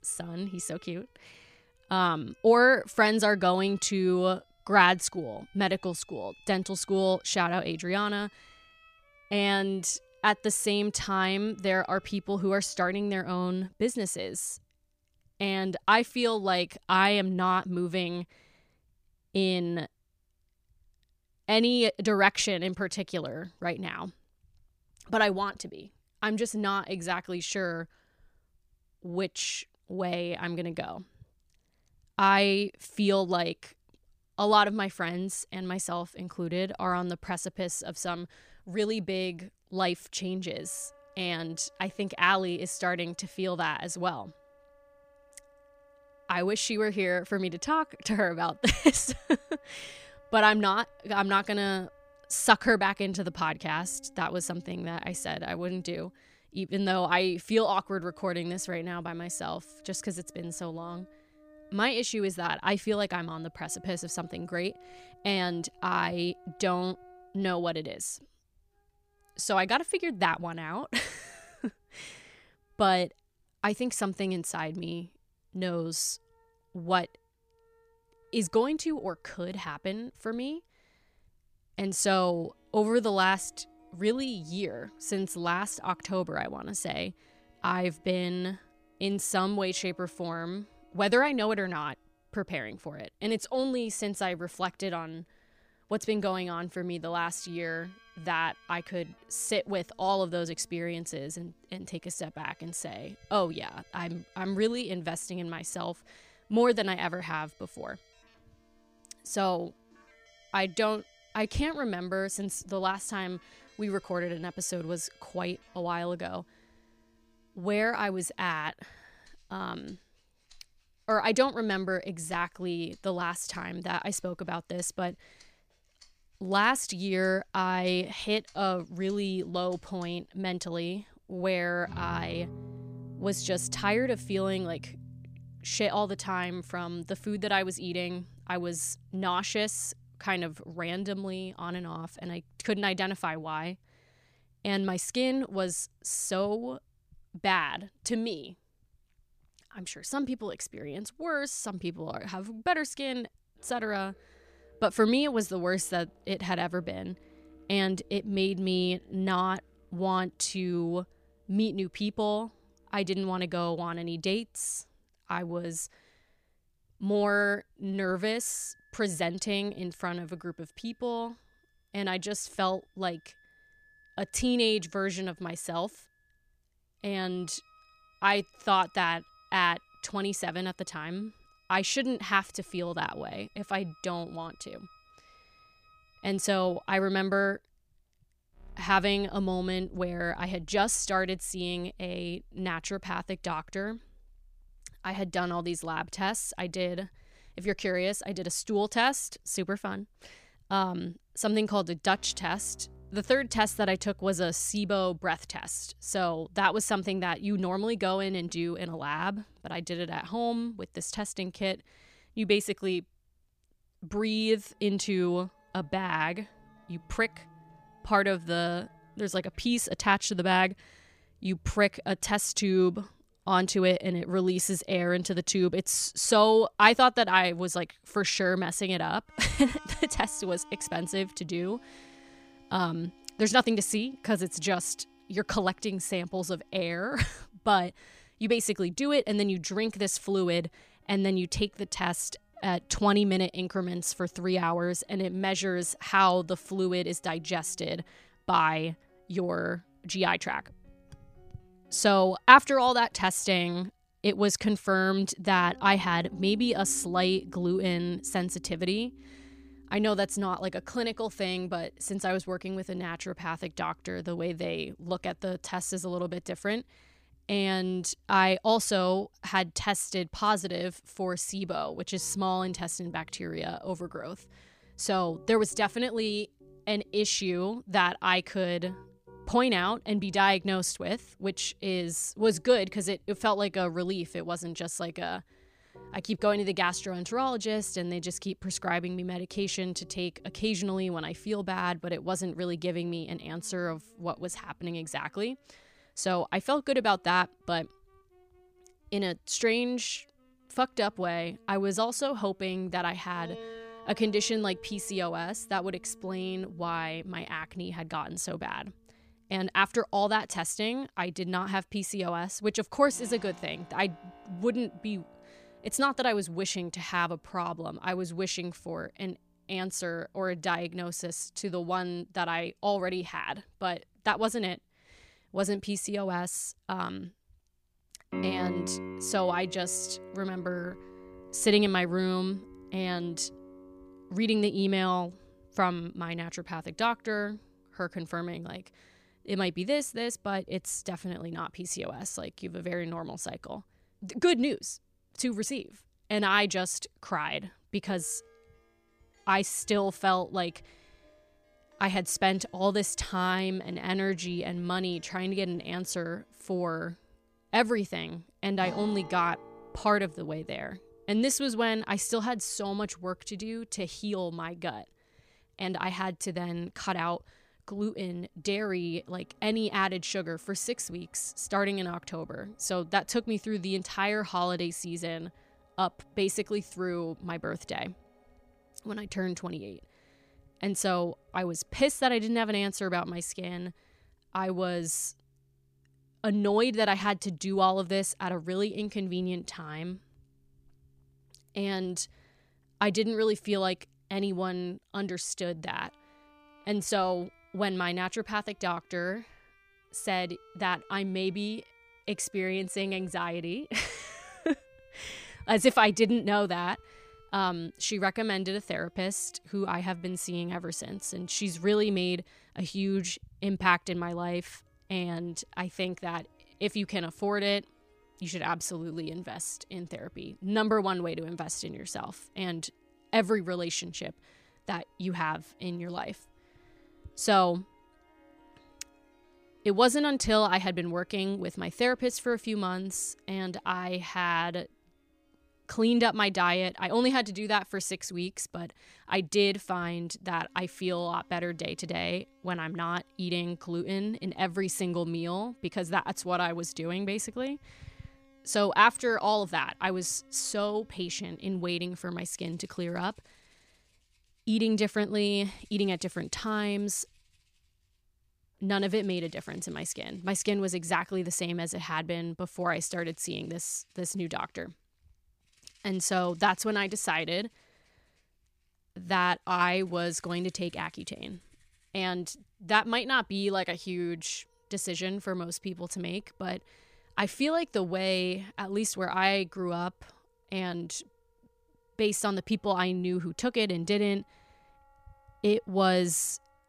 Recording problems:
background music; faint; throughout; 25 dB below the speech

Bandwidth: 15 kHz